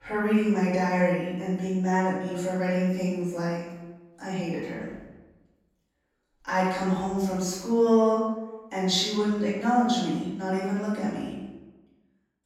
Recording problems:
off-mic speech; far
room echo; noticeable; dies away in 1 s

